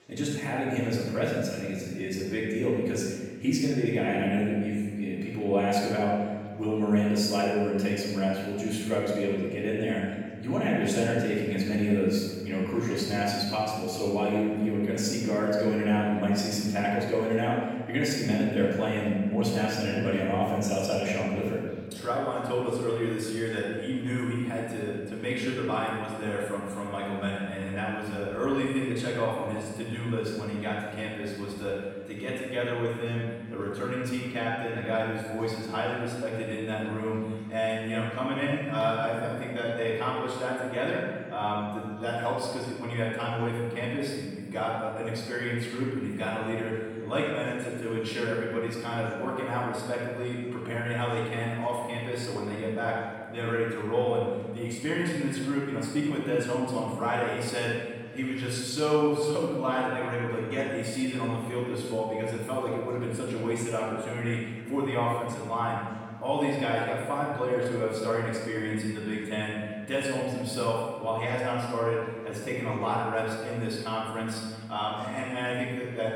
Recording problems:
room echo; strong; dies away in 1.6 s
off-mic speech; far
echo of what is said; faint; throughout; 340 ms later, 25 dB below the speech
chatter from many people; faint; throughout; 25 dB below the speech

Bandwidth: 17.5 kHz